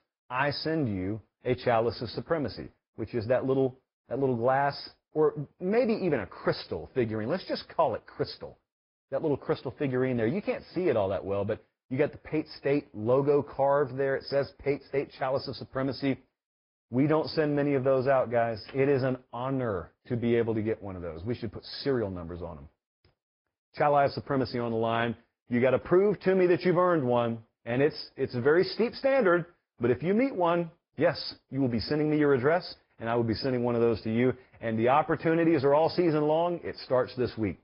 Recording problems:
high frequencies cut off; noticeable; nothing above 5 kHz
garbled, watery; slightly

